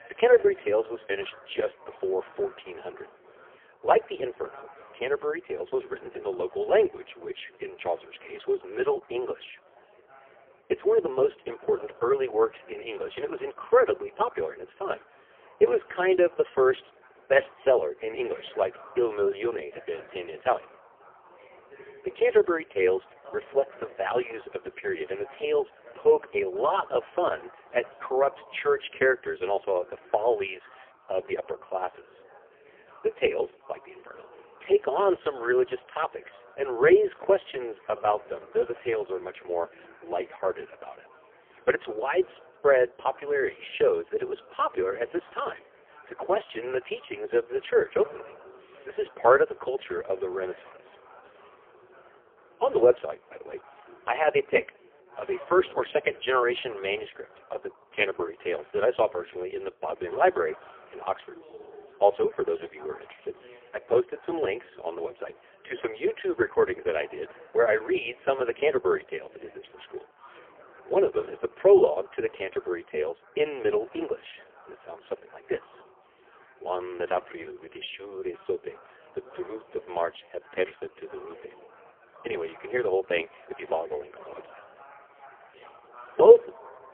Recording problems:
phone-call audio; poor line; nothing above 3.5 kHz
chatter from many people; faint; throughout; 25 dB below the speech

